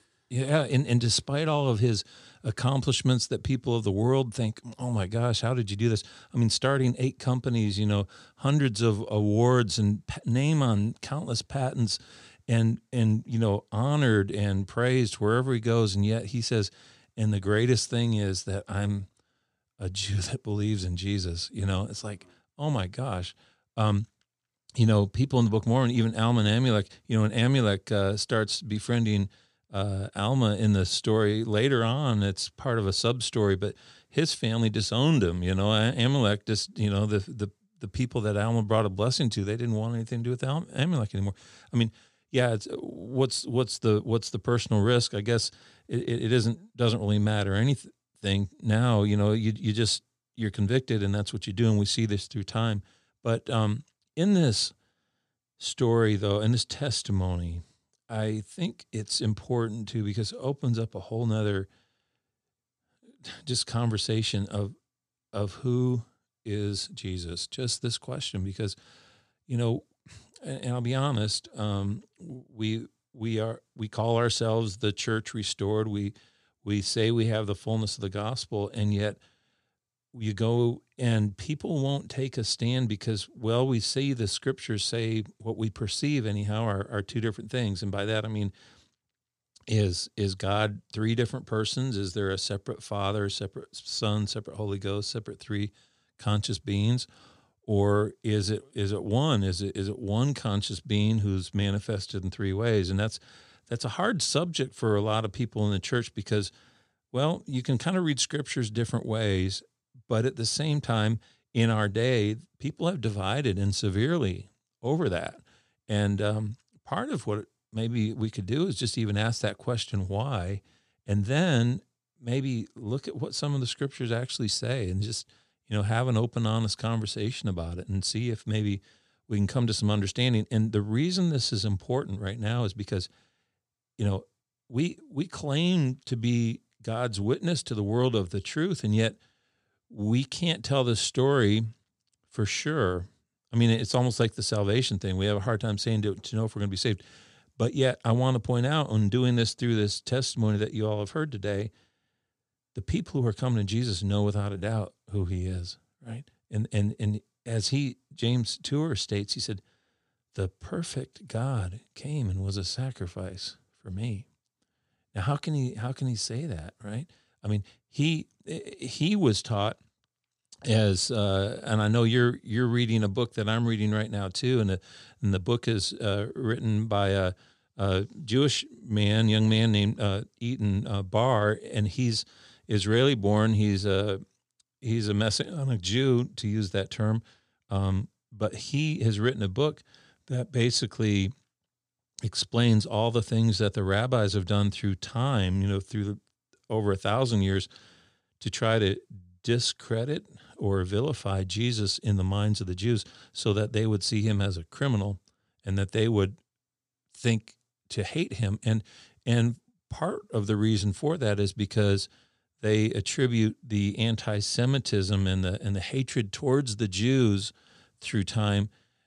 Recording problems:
none

